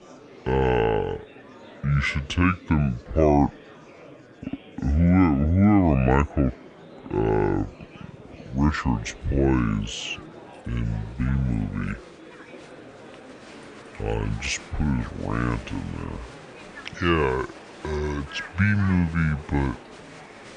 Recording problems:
wrong speed and pitch; too slow and too low; 0.6 times normal speed
murmuring crowd; noticeable; throughout; 20 dB below the speech

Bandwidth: 10 kHz